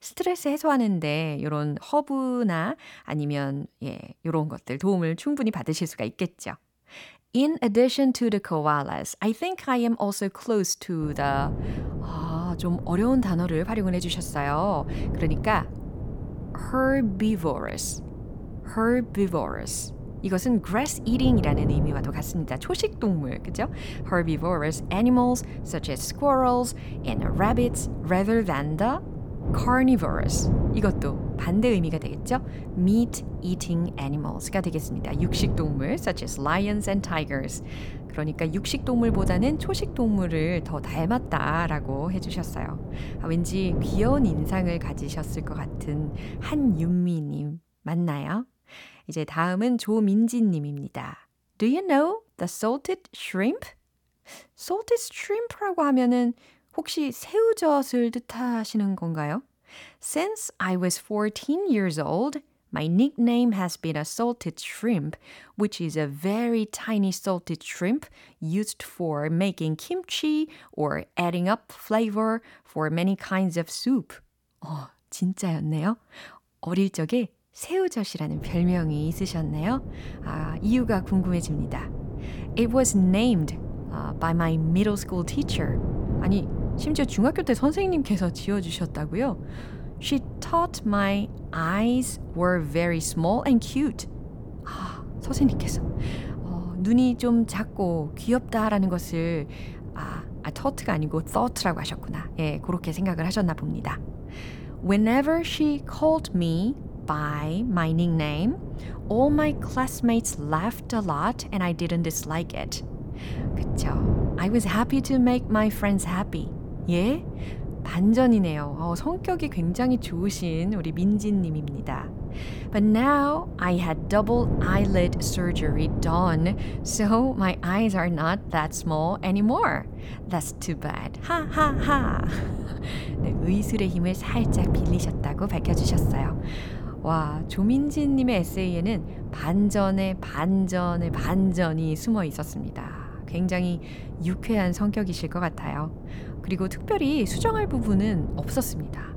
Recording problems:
wind noise on the microphone; occasional gusts; from 11 to 47 s and from 1:18 on; 15 dB below the speech

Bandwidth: 18 kHz